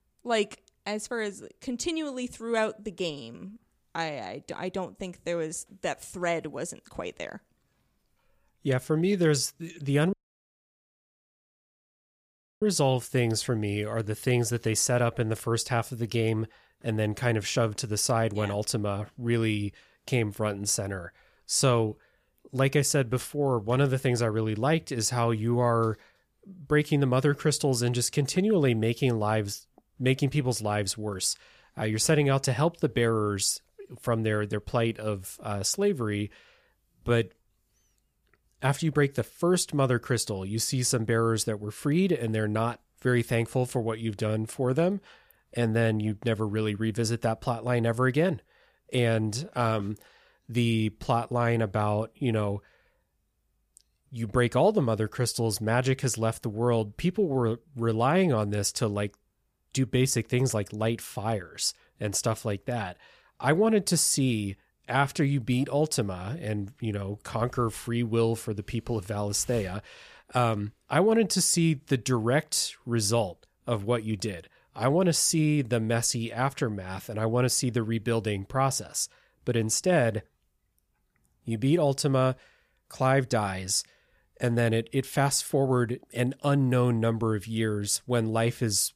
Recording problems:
audio cutting out; at 10 s for 2.5 s

